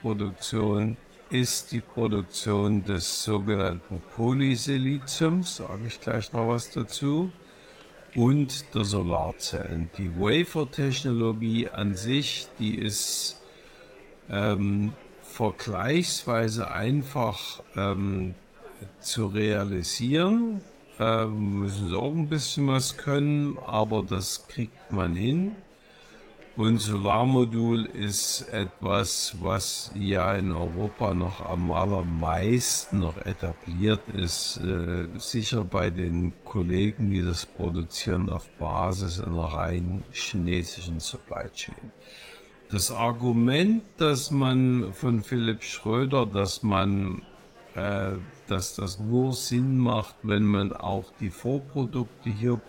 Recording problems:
wrong speed, natural pitch; too slow; 0.6 times normal speed
murmuring crowd; faint; throughout; 25 dB below the speech

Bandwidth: 16.5 kHz